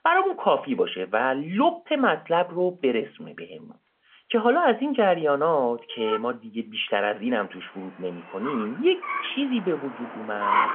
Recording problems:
phone-call audio; nothing above 3.5 kHz
traffic noise; loud; throughout; 7 dB below the speech

